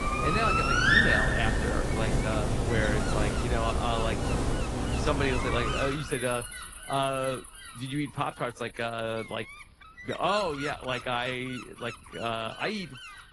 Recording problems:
garbled, watery; slightly; nothing above 10.5 kHz
animal sounds; very loud; throughout; 5 dB above the speech
wind noise on the microphone; occasional gusts; 10 dB below the speech

